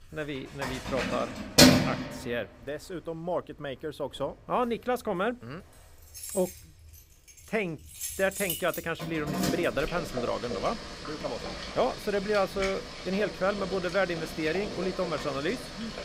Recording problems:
household noises; very loud; throughout; 1 dB above the speech

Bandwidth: 15.5 kHz